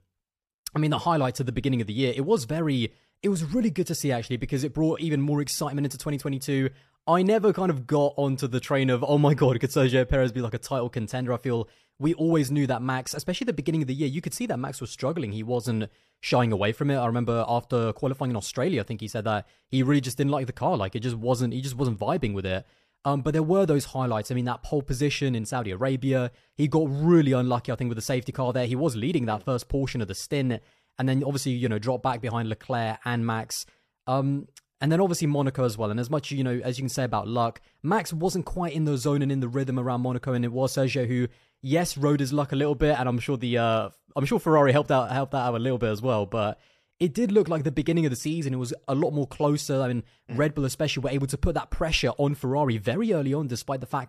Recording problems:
none

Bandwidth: 14.5 kHz